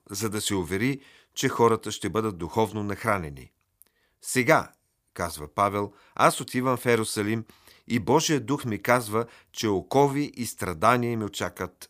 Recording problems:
none

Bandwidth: 15 kHz